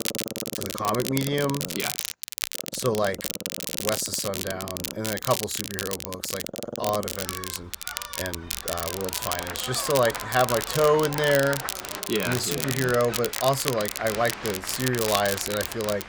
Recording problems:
crackle, like an old record; loud; 4 dB below the speech
animal sounds; noticeable; throughout; 15 dB below the speech
crowd noise; noticeable; from 9 s on; 10 dB below the speech

